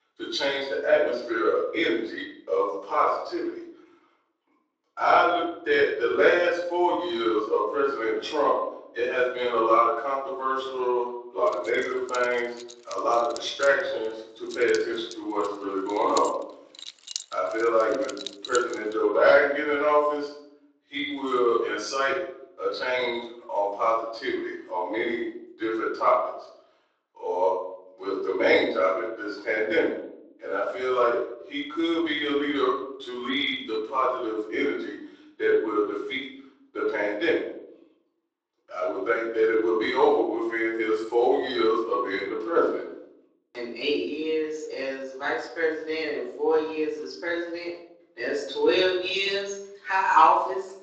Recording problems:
off-mic speech; far
room echo; noticeable; dies away in 0.6 s
garbled, watery; slightly; nothing above 7.5 kHz
thin; very slightly; fading below 300 Hz
jangling keys; noticeable; from 12 to 19 s; peak 9 dB below the speech

